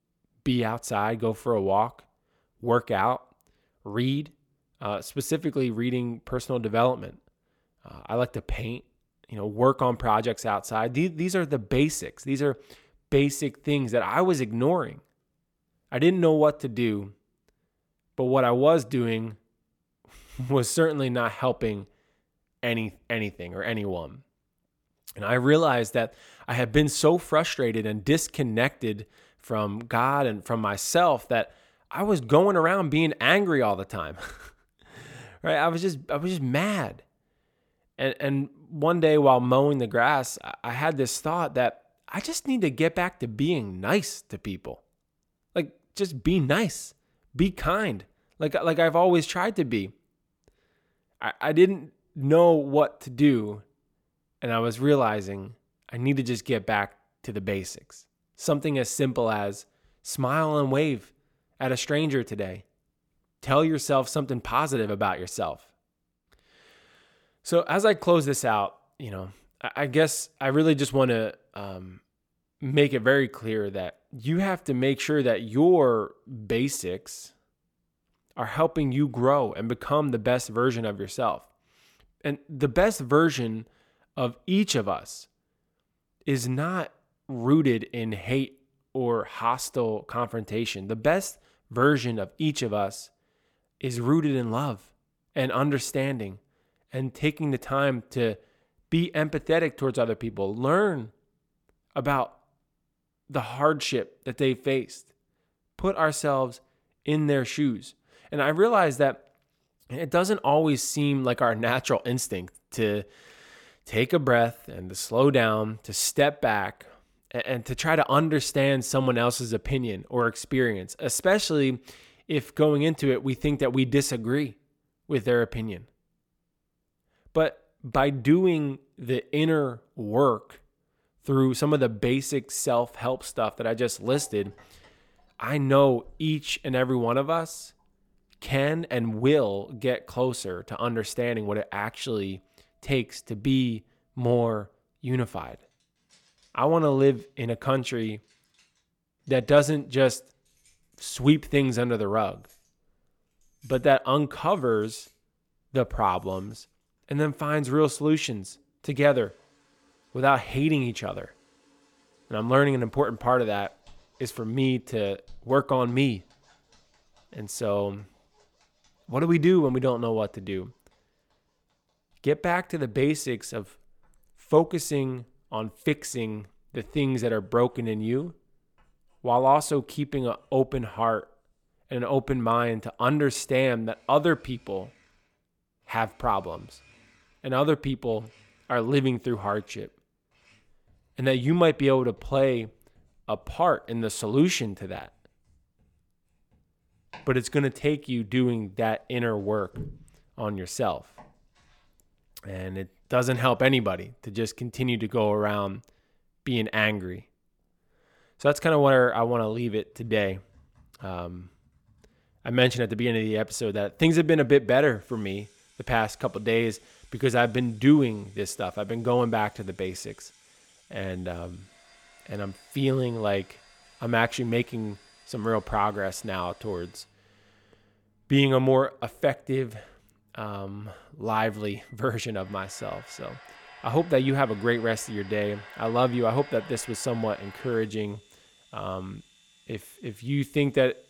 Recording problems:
household noises; faint; from 2:13 on; 30 dB below the speech

